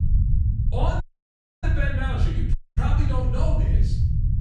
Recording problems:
off-mic speech; far
room echo; noticeable; dies away in 0.7 s
low rumble; loud; throughout; 7 dB below the speech
audio cutting out; at 1 s for 0.5 s and at 2.5 s

